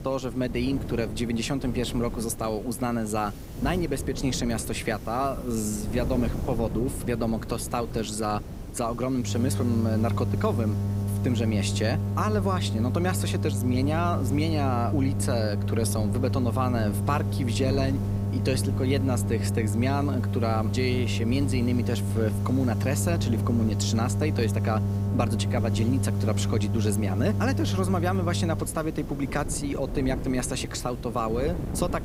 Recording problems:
electrical hum; loud; from 9.5 to 29 s; 50 Hz, 8 dB below the speech
wind noise on the microphone; occasional gusts; 15 dB below the speech
hiss; faint; throughout; 20 dB below the speech

